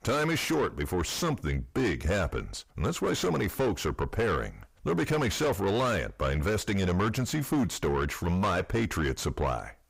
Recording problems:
distortion; heavy; 6 dB below the speech

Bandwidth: 15.5 kHz